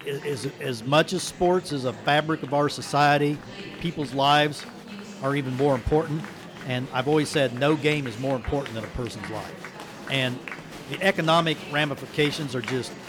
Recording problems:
murmuring crowd; noticeable; throughout; 15 dB below the speech

